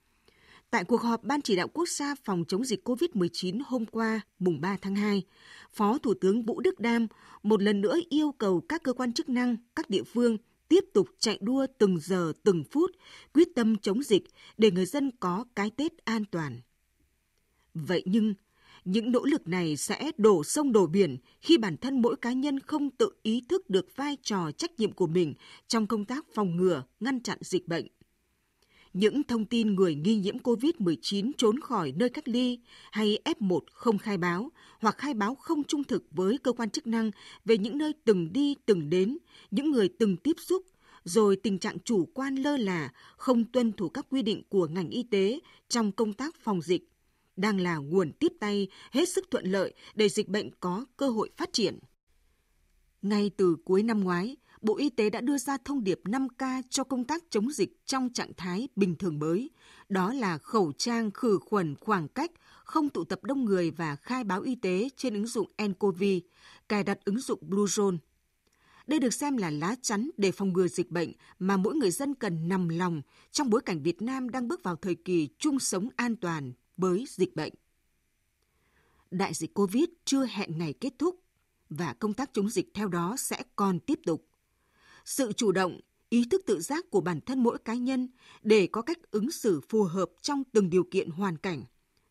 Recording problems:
none

